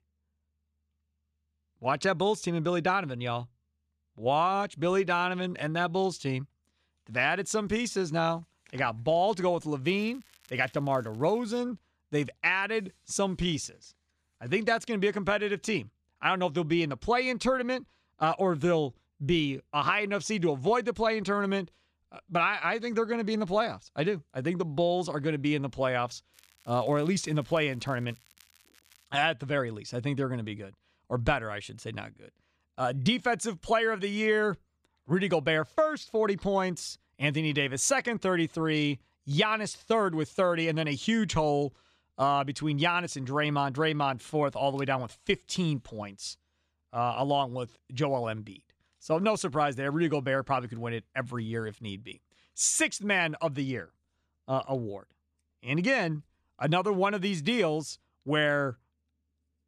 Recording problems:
crackling; faint; from 10 to 12 s and from 26 to 29 s; 30 dB below the speech

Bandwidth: 14.5 kHz